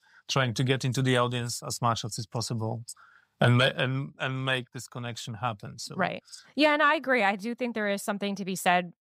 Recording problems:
none

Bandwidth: 15.5 kHz